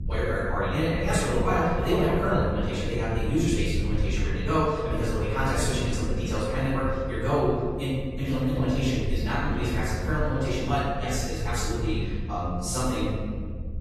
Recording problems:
room echo; strong; dies away in 1.5 s
off-mic speech; far
wrong speed, natural pitch; too fast; 1.5 times normal speed
garbled, watery; slightly; nothing above 14.5 kHz
low rumble; noticeable; throughout; 20 dB below the speech

